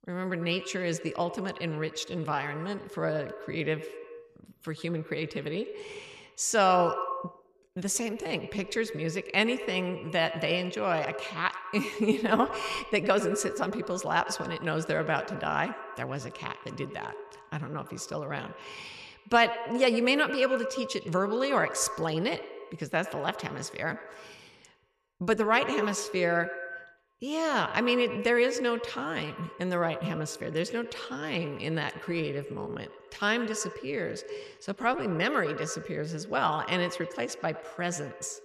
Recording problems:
echo of what is said; strong; throughout; 100 ms later, 10 dB below the speech

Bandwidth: 13.5 kHz